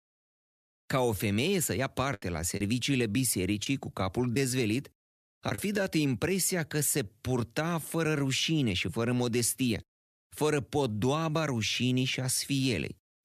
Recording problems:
choppy; occasionally; from 2 to 5.5 s; 5% of the speech affected

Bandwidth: 14.5 kHz